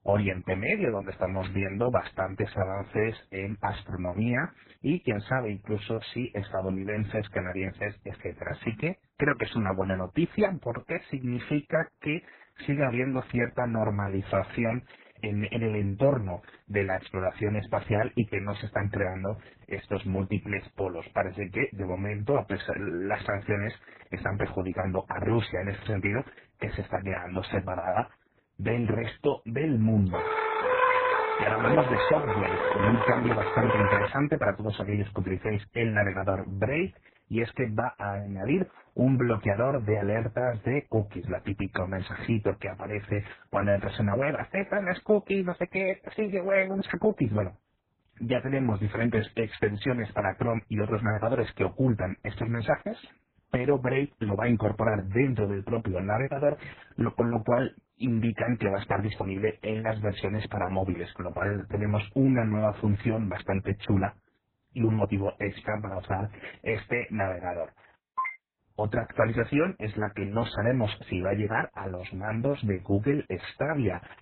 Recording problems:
garbled, watery; badly; nothing above 4 kHz
muffled; very slightly; fading above 2.5 kHz
siren; loud; from 30 to 34 s; peak 4 dB above the speech

